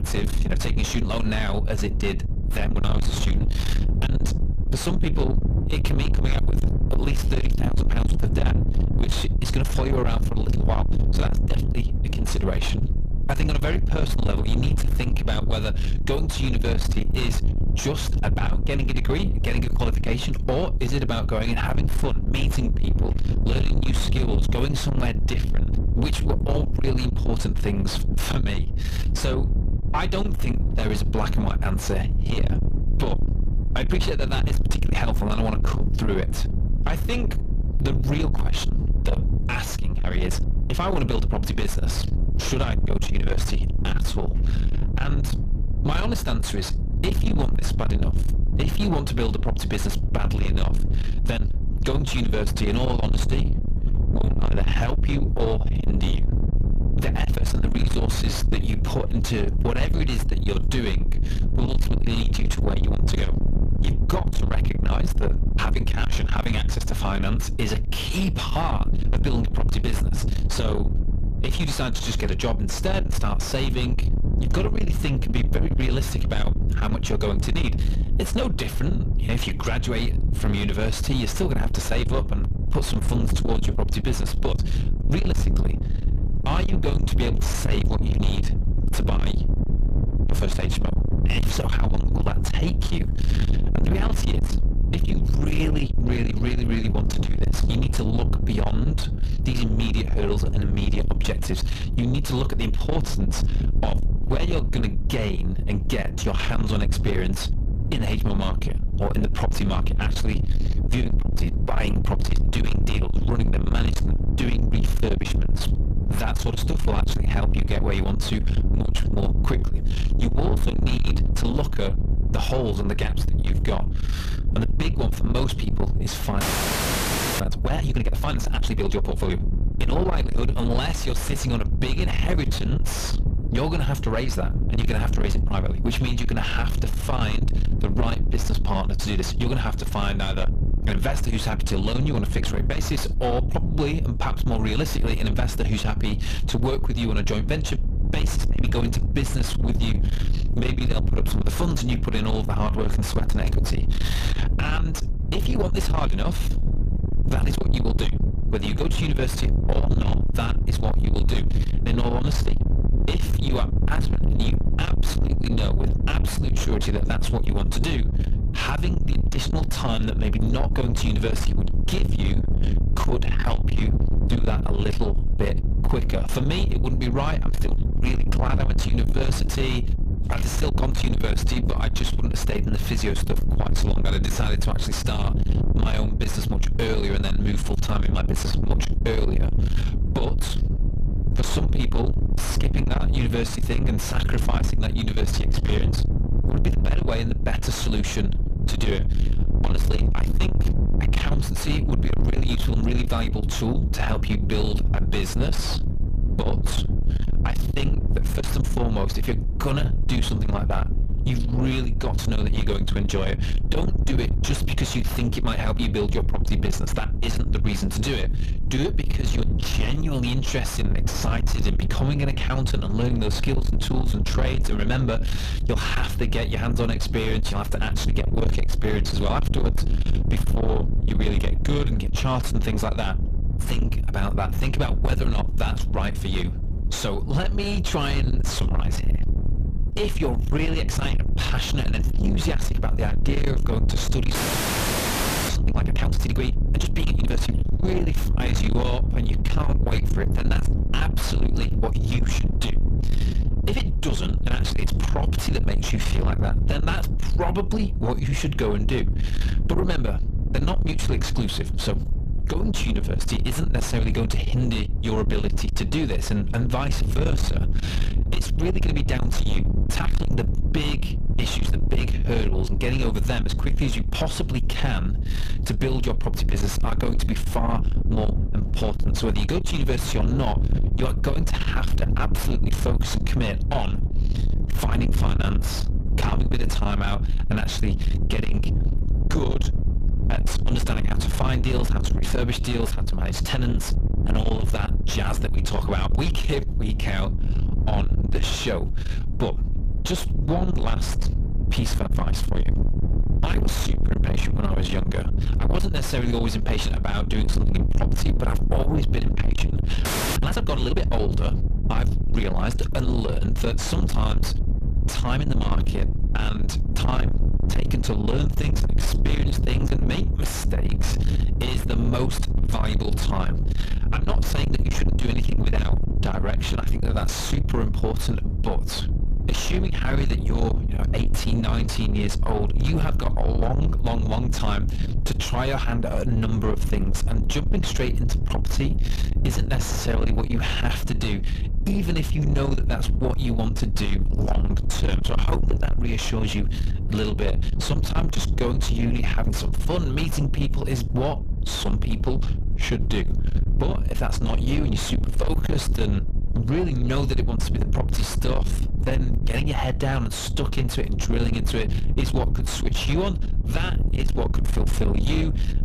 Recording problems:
distortion; heavy; 6 dB below the speech
low rumble; loud; throughout; 6 dB below the speech
audio freezing; at 2:06 for 1 s, at 4:04 for 1 s and at 5:10

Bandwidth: 14.5 kHz